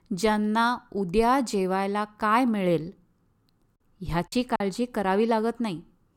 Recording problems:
choppy; very; at 4.5 s; 10% of the speech affected

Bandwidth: 17 kHz